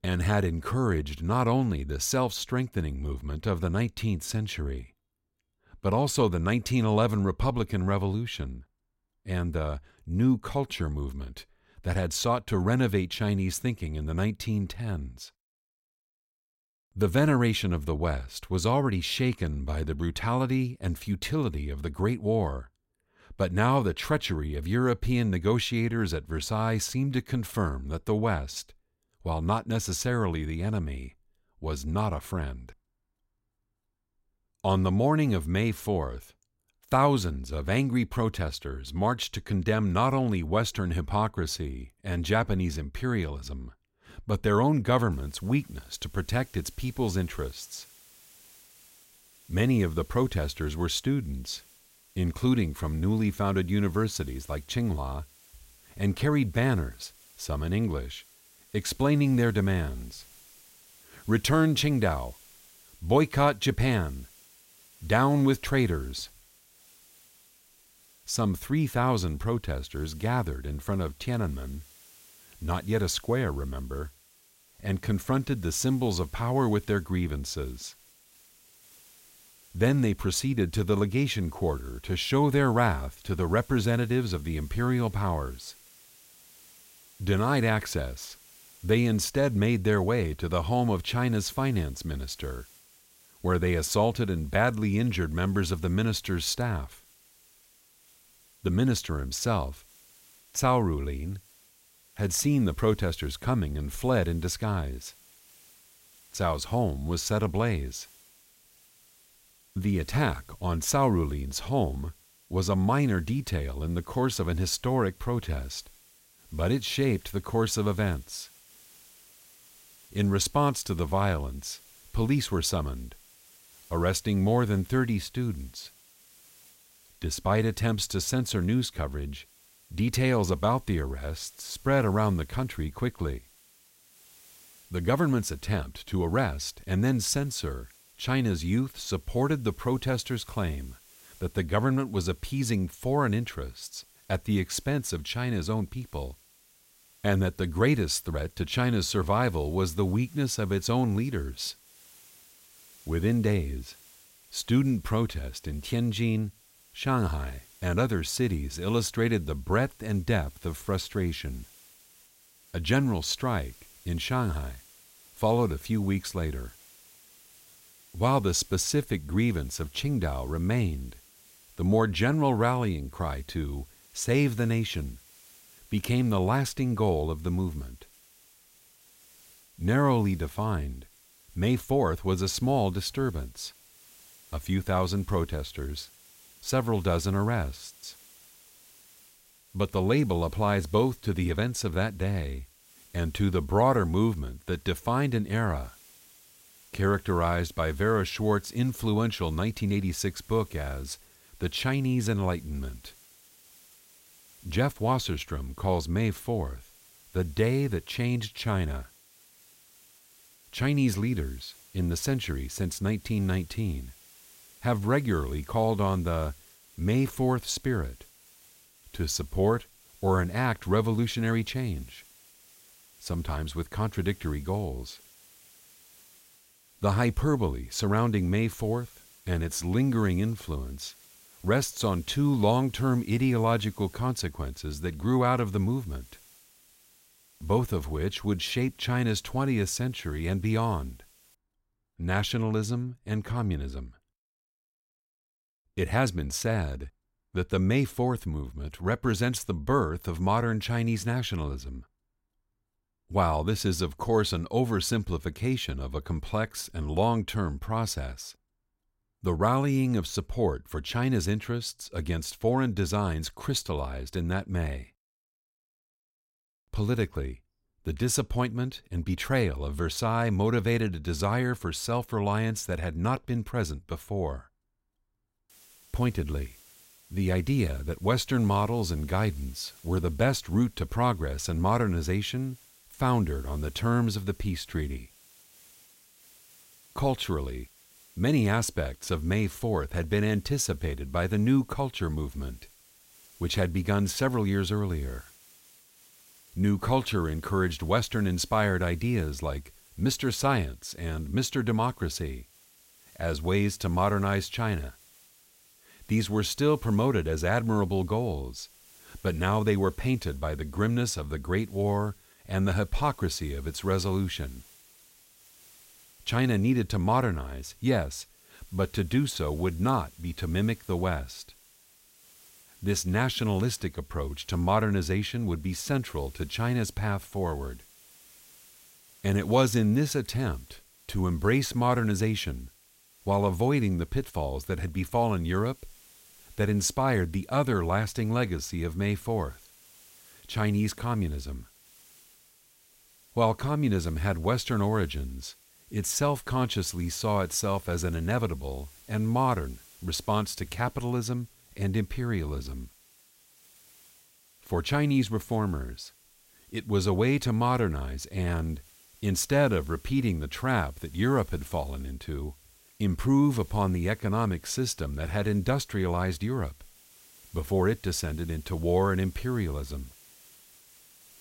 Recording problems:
hiss; faint; from 45 s to 4:02 and from 4:36 on; 25 dB below the speech

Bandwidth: 16 kHz